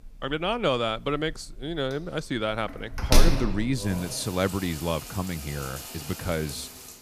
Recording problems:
household noises; loud; throughout; 3 dB below the speech

